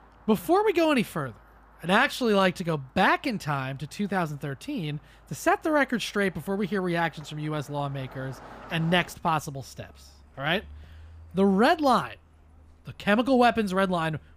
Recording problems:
traffic noise; faint; throughout; 25 dB below the speech

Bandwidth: 15 kHz